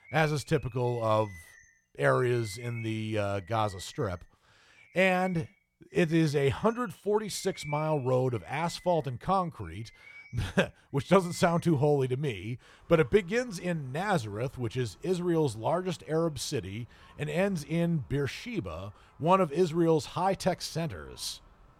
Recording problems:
animal sounds; faint; throughout; 25 dB below the speech

